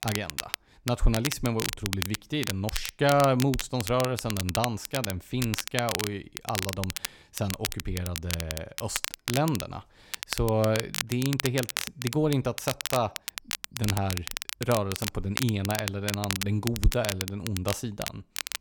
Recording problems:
crackle, like an old record; loud; 4 dB below the speech

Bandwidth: 18 kHz